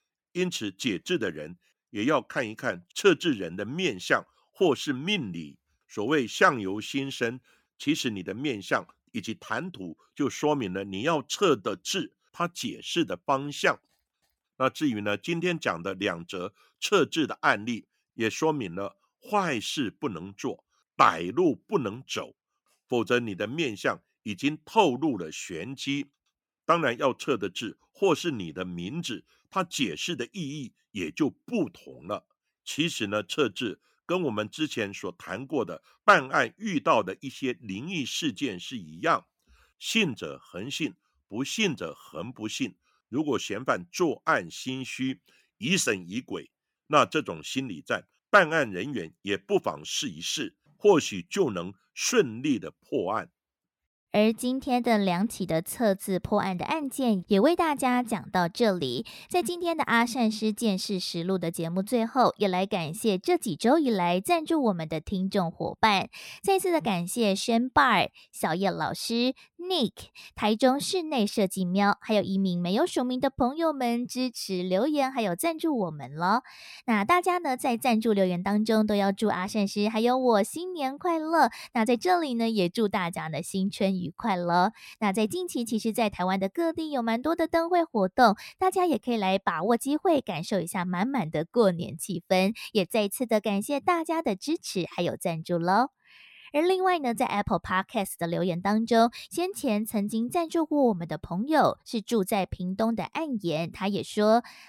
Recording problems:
none

